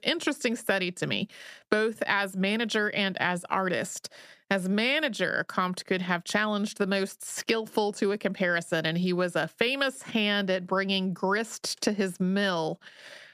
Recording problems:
squashed, flat; somewhat

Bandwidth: 14.5 kHz